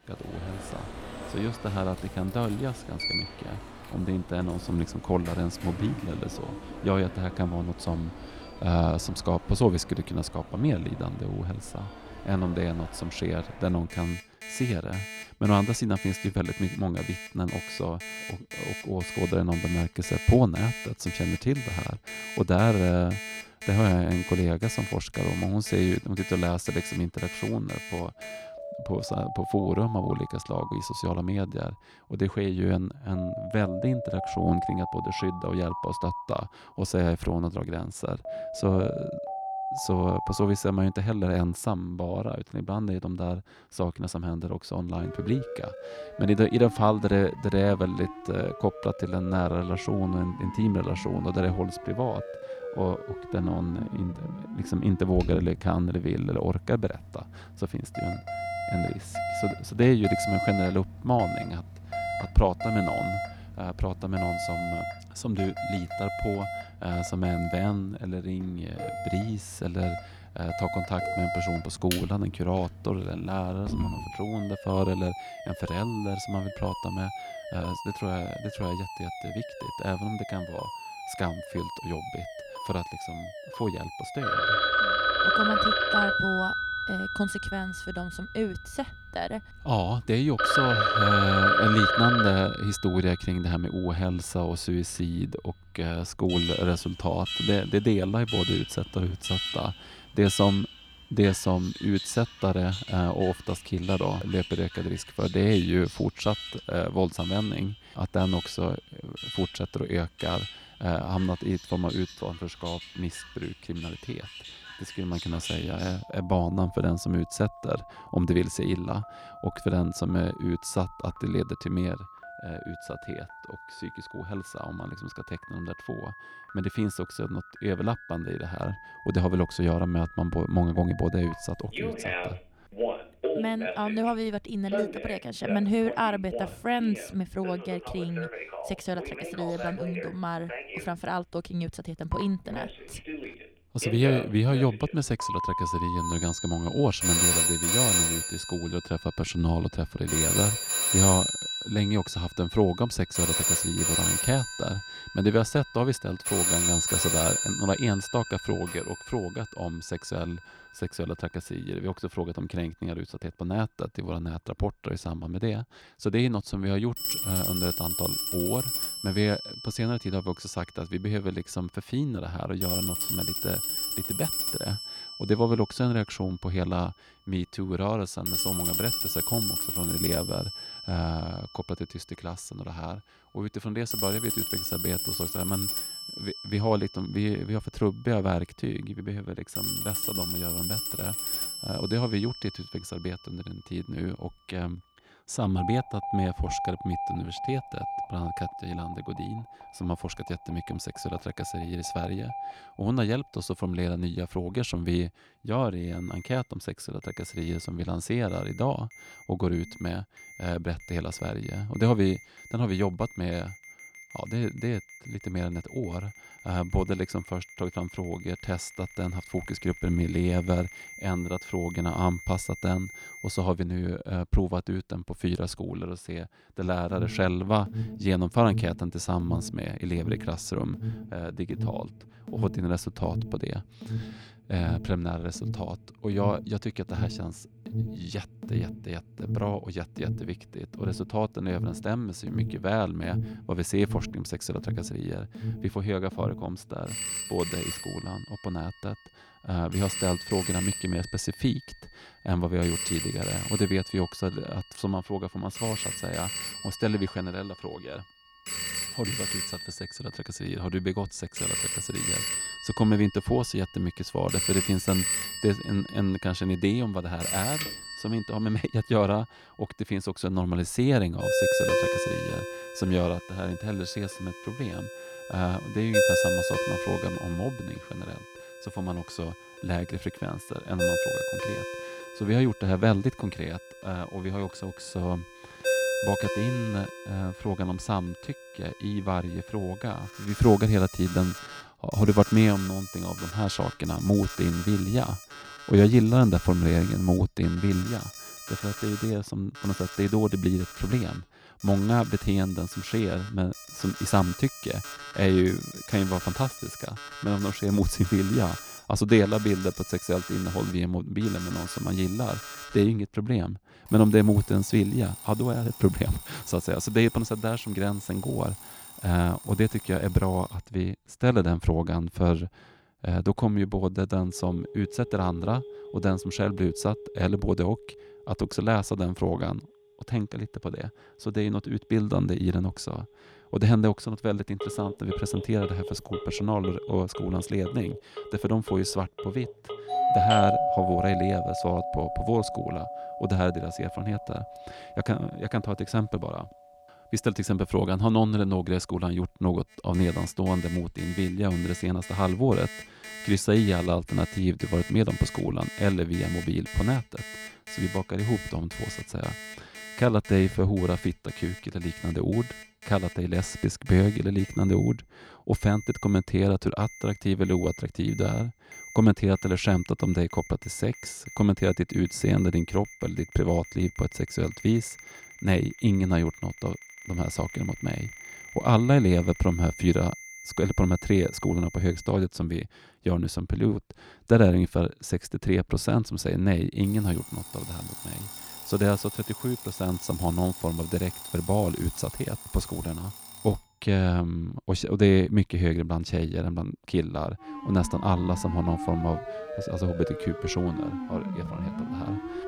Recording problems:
alarms or sirens; loud; throughout; 4 dB below the speech

